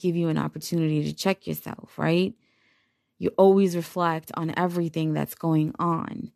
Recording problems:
none

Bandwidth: 13.5 kHz